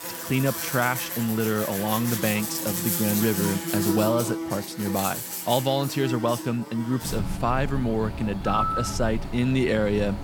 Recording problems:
animal sounds; loud; throughout; 4 dB below the speech

